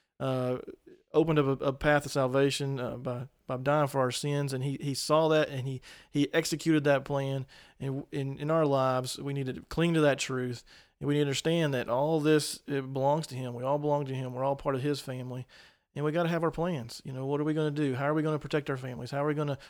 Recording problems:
none

